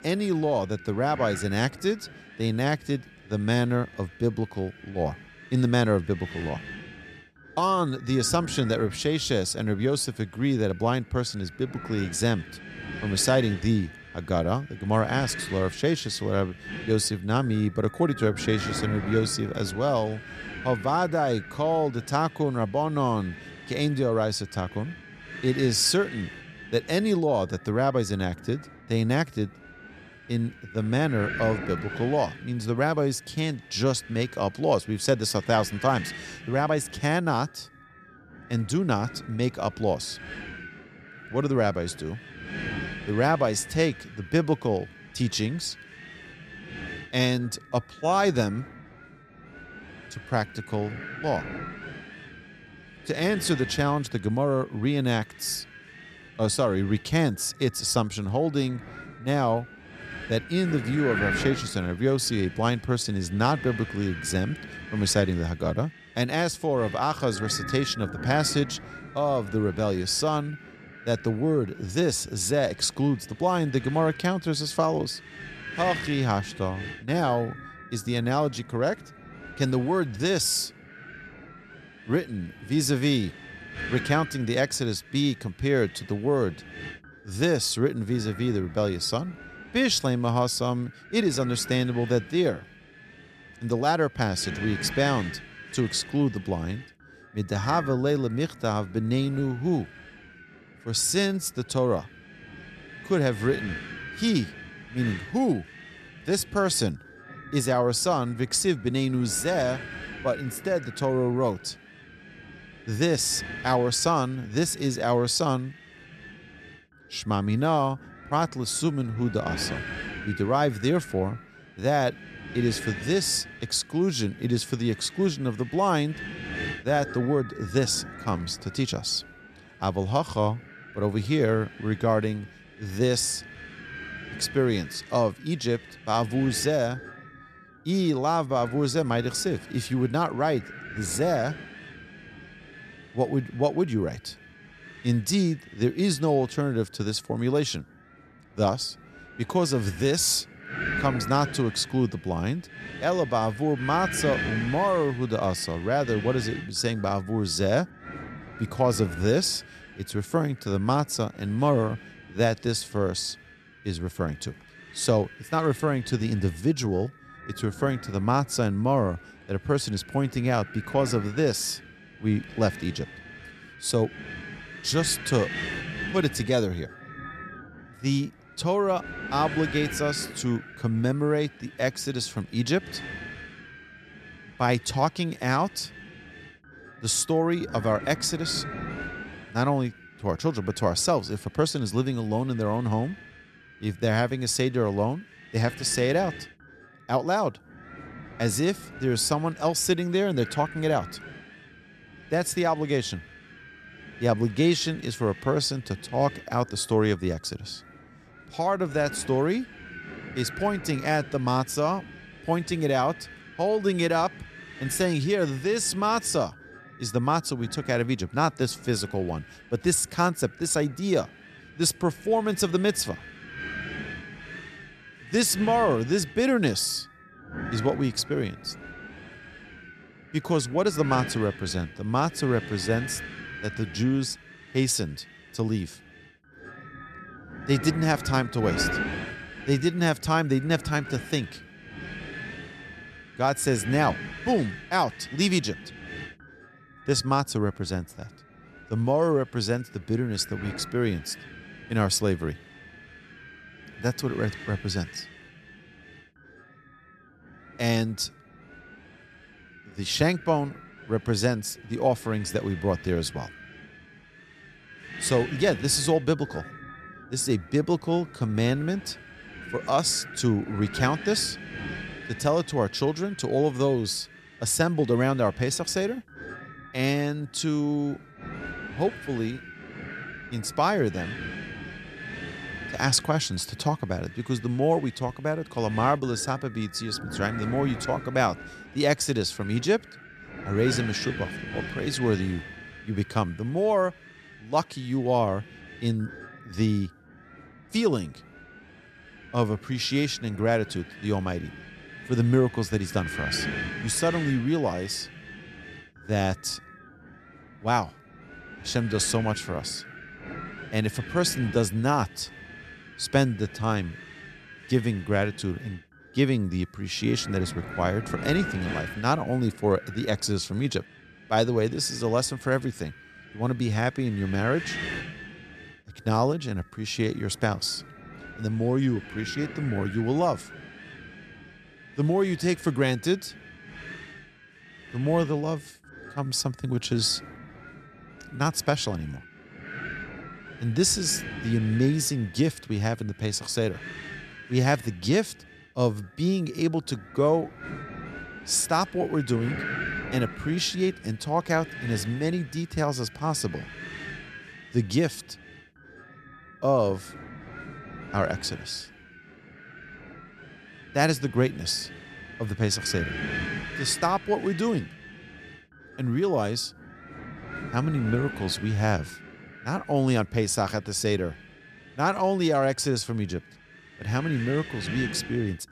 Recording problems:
wind noise on the microphone; occasional gusts; 10 dB below the speech

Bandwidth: 13.5 kHz